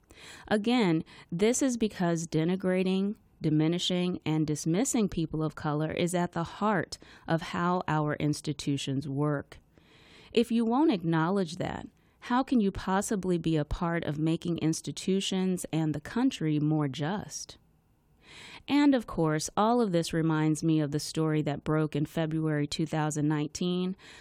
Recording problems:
none

